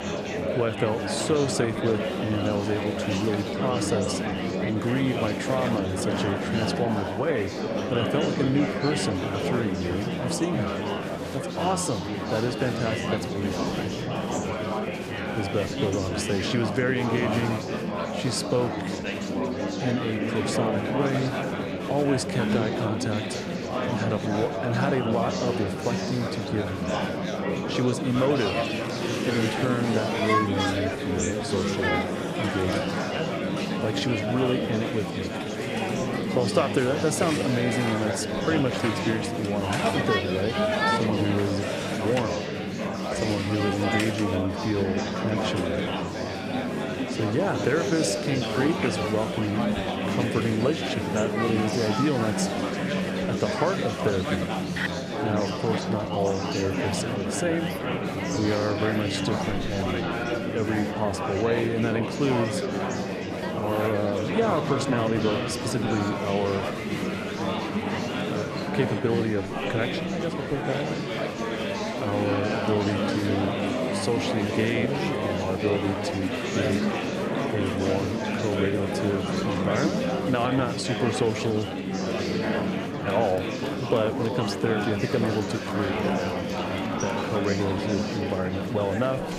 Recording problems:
murmuring crowd; very loud; throughout; as loud as the speech

